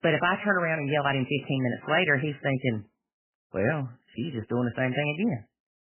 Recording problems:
garbled, watery; badly; nothing above 3 kHz

